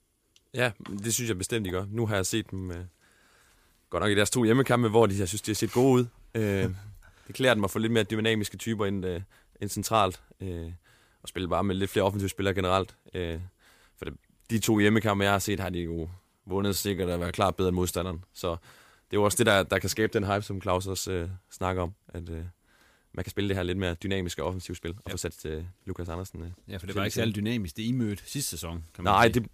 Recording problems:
uneven, jittery; strongly; from 6.5 to 27 s

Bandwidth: 15 kHz